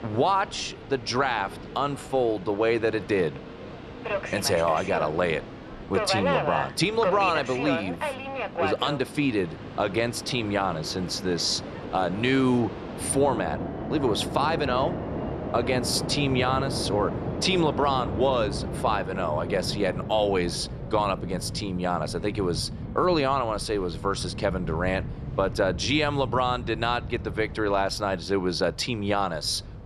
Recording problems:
train or aircraft noise; loud; throughout; 7 dB below the speech

